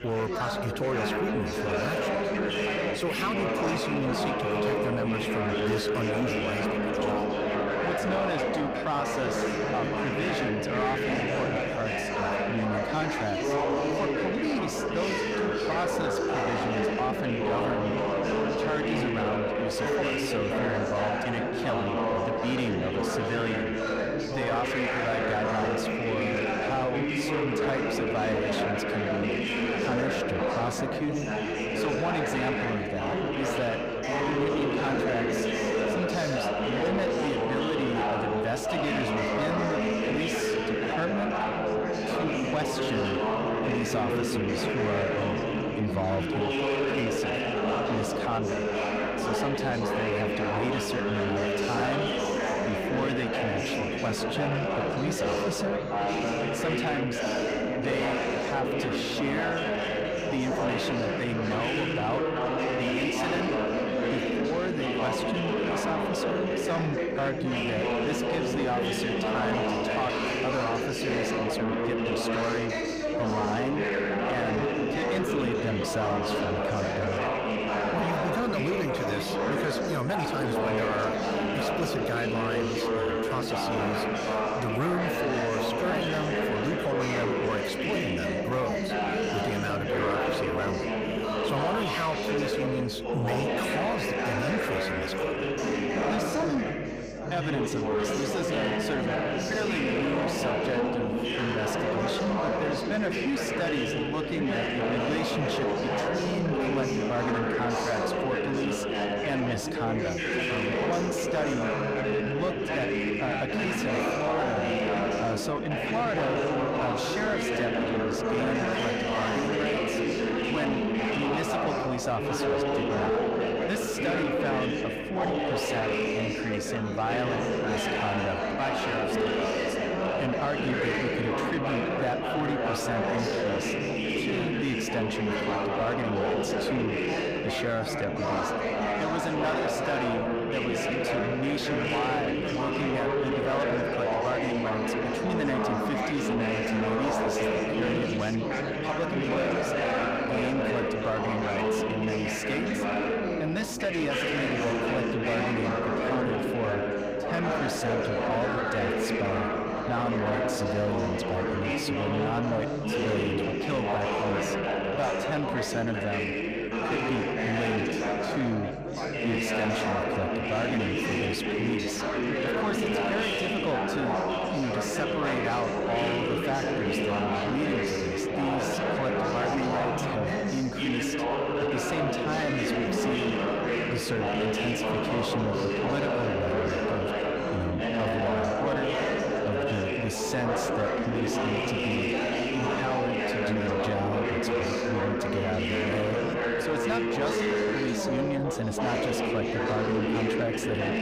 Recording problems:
distortion; slight; 10 dB below the speech
chatter from many people; very loud; throughout; 3 dB above the speech
electrical hum; faint; throughout; 50 Hz, 25 dB below the speech

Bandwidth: 15.5 kHz